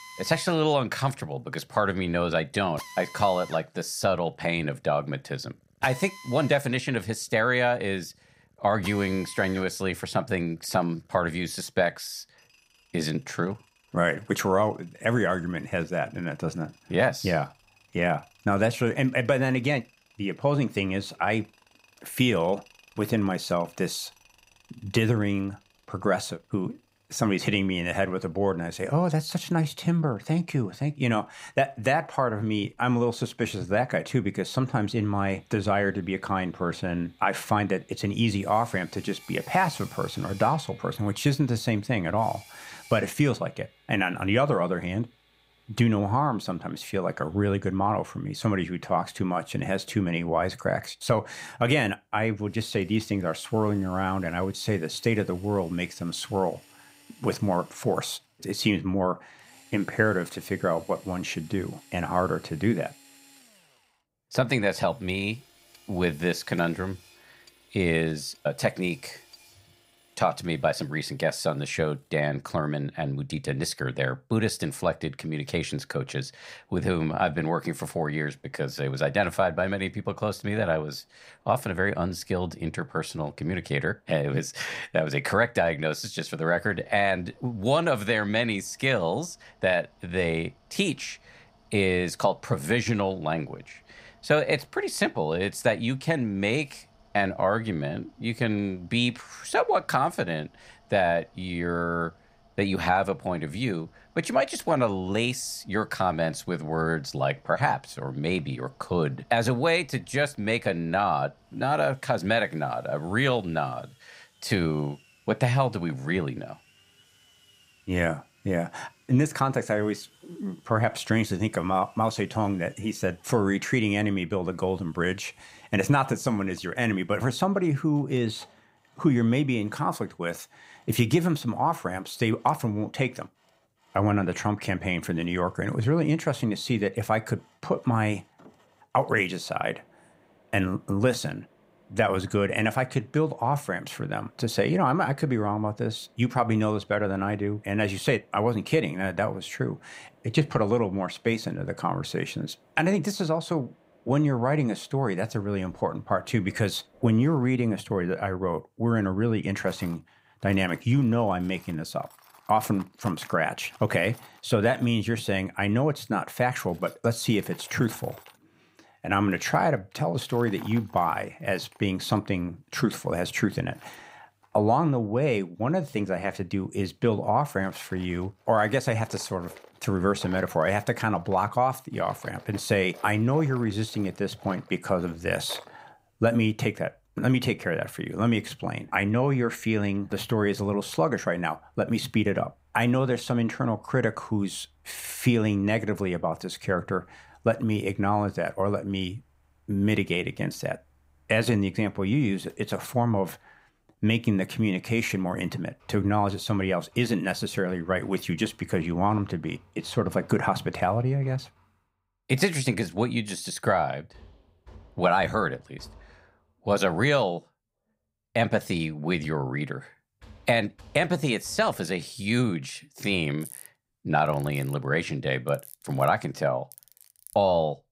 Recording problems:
machinery noise; faint; throughout; 25 dB below the speech

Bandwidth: 15.5 kHz